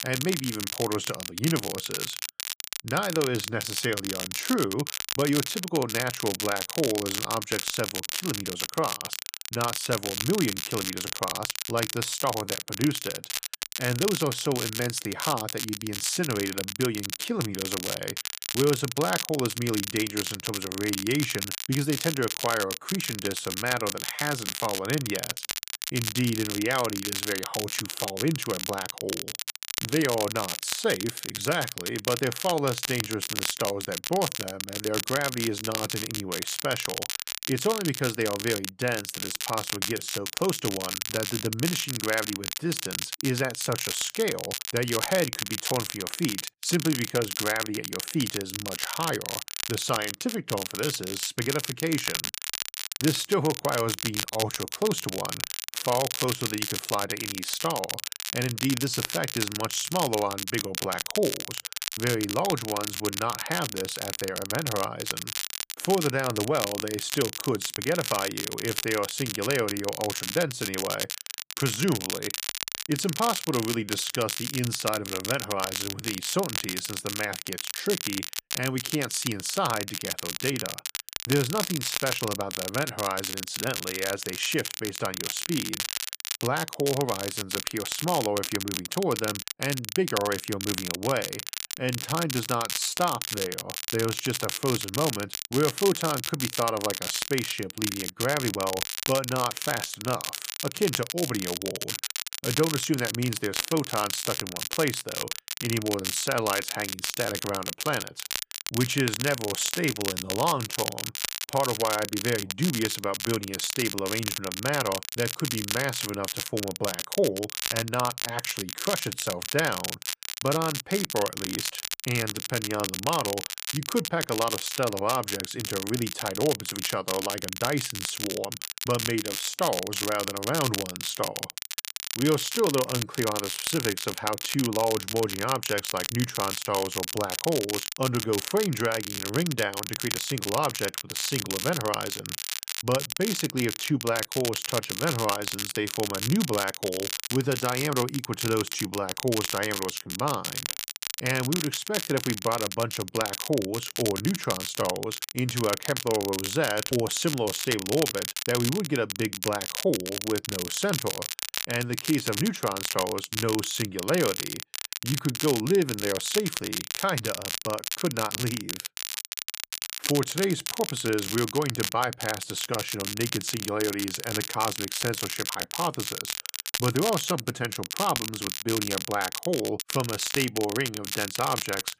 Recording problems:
crackle, like an old record; loud; 2 dB below the speech

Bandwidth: 15 kHz